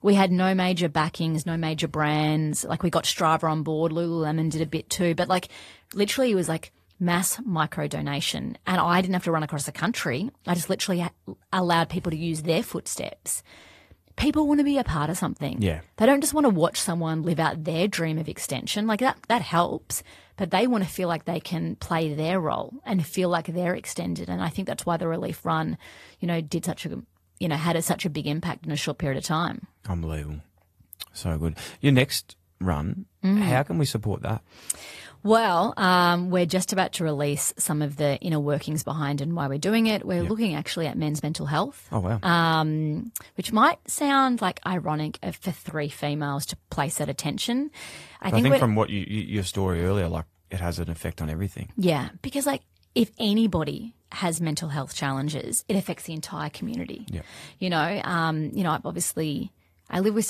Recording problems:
garbled, watery; slightly; nothing above 14.5 kHz
abrupt cut into speech; at the end

